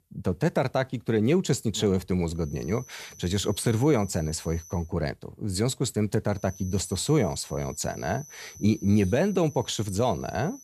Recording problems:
high-pitched whine; noticeable; from 2.5 to 5 s and from 6.5 s on; 6 kHz, 20 dB below the speech

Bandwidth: 14.5 kHz